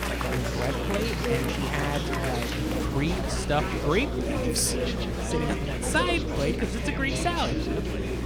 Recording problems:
chatter from many people; loud; throughout; 1 dB below the speech
electrical hum; noticeable; throughout; 60 Hz, 15 dB below the speech

